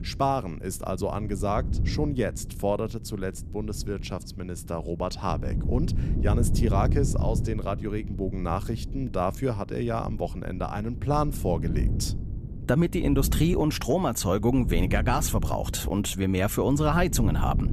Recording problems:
wind noise on the microphone; occasional gusts; 15 dB below the speech

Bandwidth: 14.5 kHz